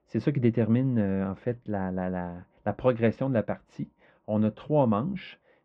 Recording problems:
muffled; very; fading above 2 kHz

